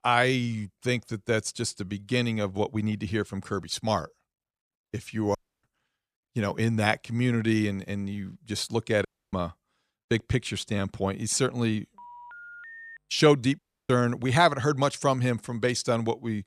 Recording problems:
audio cutting out; at 5.5 s, at 9 s and at 14 s
phone ringing; faint; at 12 s; peak 15 dB below the speech

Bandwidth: 14.5 kHz